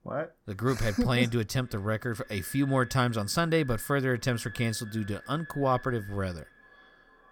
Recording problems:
echo of what is said; faint; throughout; 460 ms later, 20 dB below the speech

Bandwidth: 17 kHz